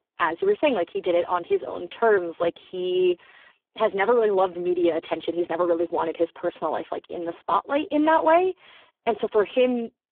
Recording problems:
phone-call audio; poor line
muffled; very slightly; fading above 4 kHz

